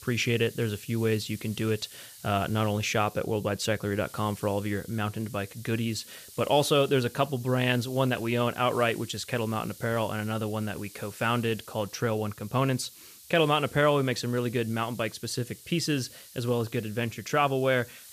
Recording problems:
hiss; noticeable; throughout; 20 dB below the speech

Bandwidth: 14.5 kHz